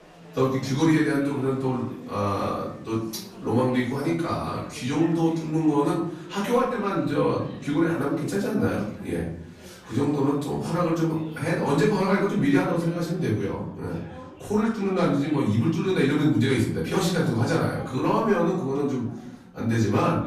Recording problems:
off-mic speech; far
room echo; noticeable; dies away in 0.6 s
chatter from many people; faint; throughout; 20 dB below the speech

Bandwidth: 14.5 kHz